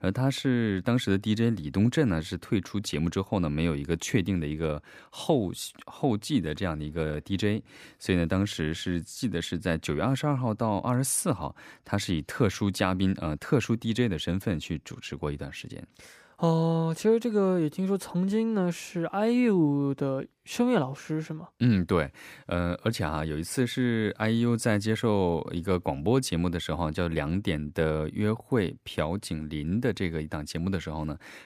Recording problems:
none

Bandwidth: 15 kHz